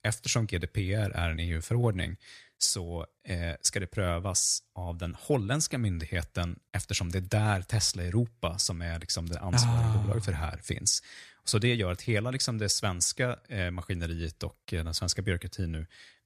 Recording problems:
none

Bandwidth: 14.5 kHz